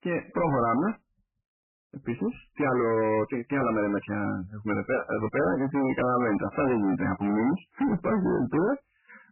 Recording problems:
distortion; heavy; 20% of the sound clipped
garbled, watery; badly; nothing above 2.5 kHz

